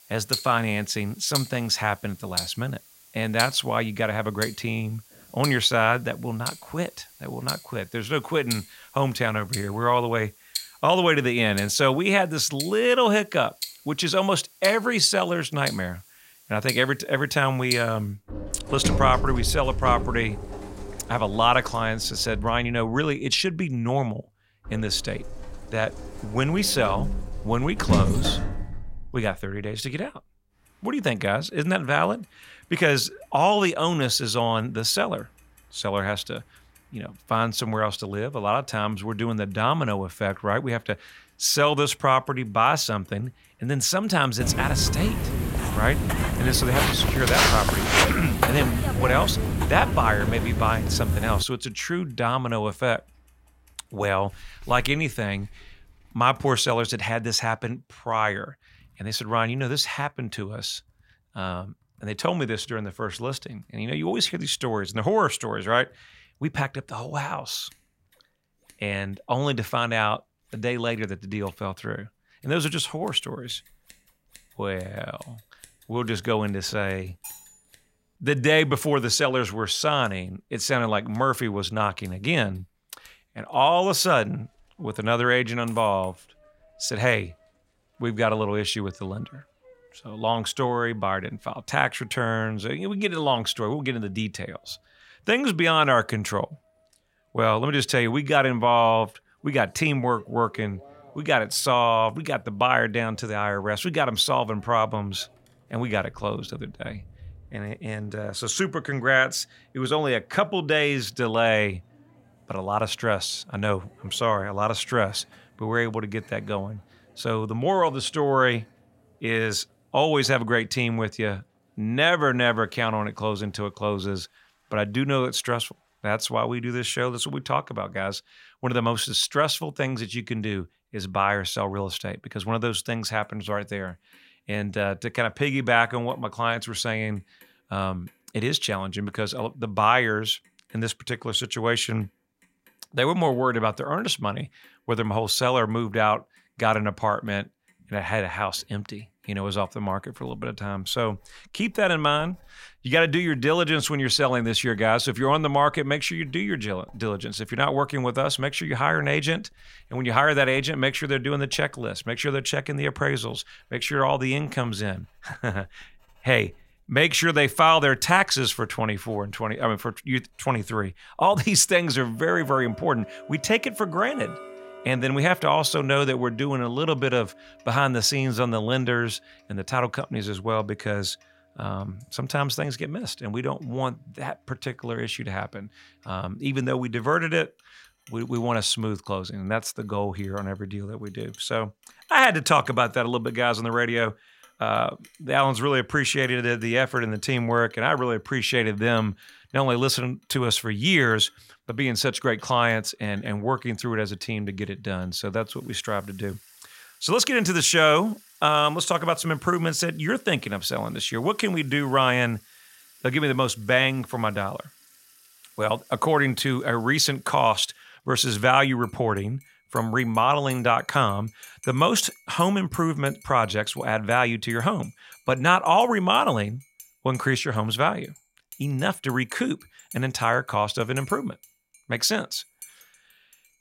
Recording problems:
household noises; noticeable; throughout; 15 dB below the speech
footsteps; loud; from 44 to 51 s; peak 6 dB above the speech
clattering dishes; faint; at 1:17; peak 15 dB below the speech

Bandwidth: 16 kHz